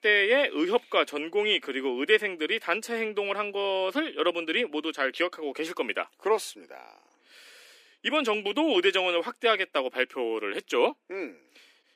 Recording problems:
thin; somewhat; fading below 300 Hz

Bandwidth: 15 kHz